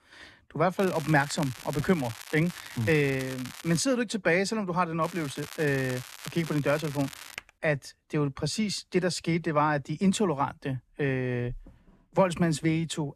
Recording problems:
crackling; noticeable; from 1 to 4 s and from 5 to 7.5 s; 15 dB below the speech
keyboard typing; very faint; at 7.5 s; peak 15 dB below the speech

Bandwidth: 13.5 kHz